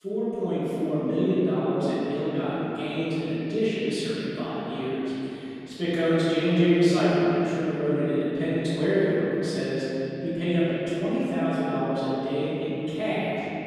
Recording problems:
room echo; strong; dies away in 3 s
off-mic speech; far

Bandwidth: 15 kHz